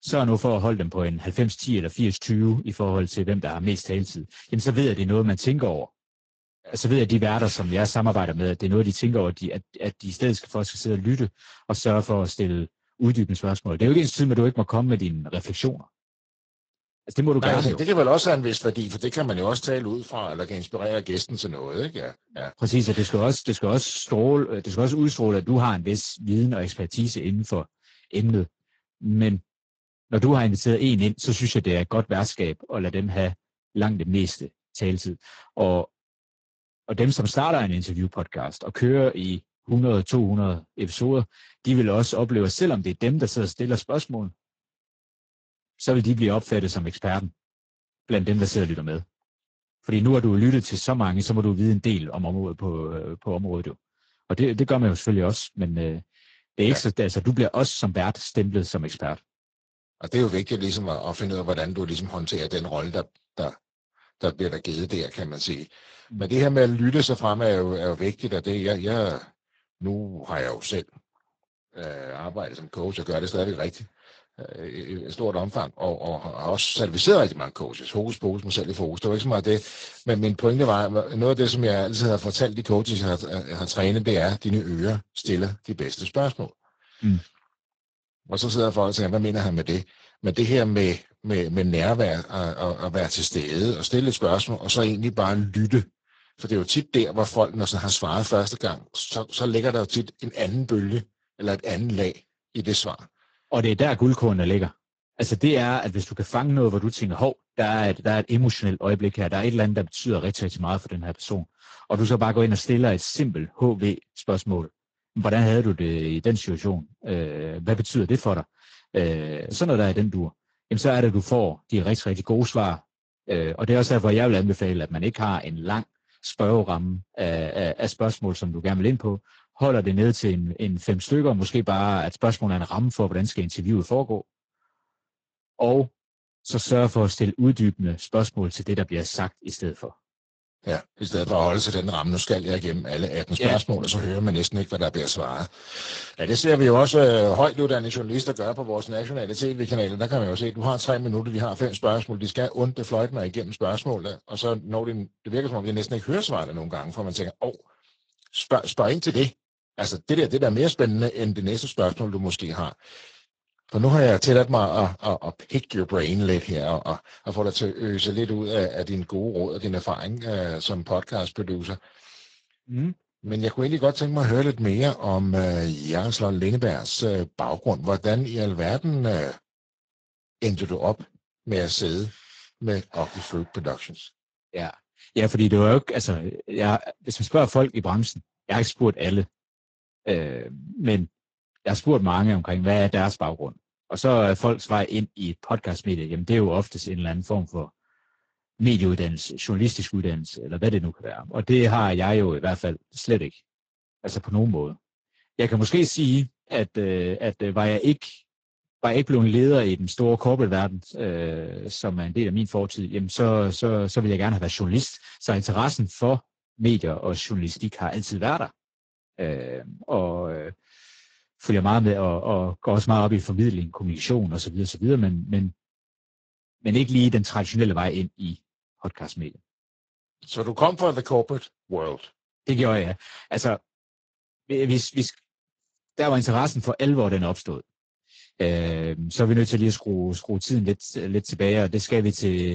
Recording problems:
garbled, watery; slightly; nothing above 7.5 kHz
abrupt cut into speech; at the end

